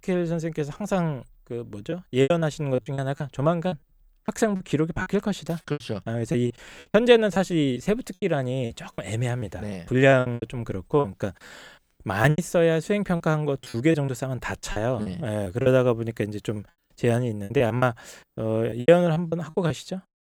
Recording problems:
choppy; very; 10% of the speech affected

